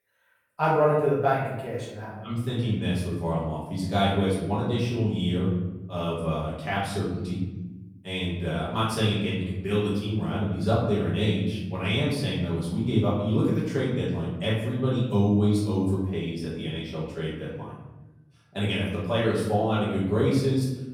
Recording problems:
off-mic speech; far
room echo; noticeable; dies away in 1.1 s

